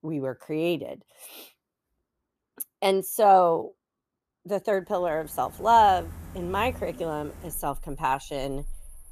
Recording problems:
animal sounds; noticeable; from 5 s on; 20 dB below the speech

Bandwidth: 14.5 kHz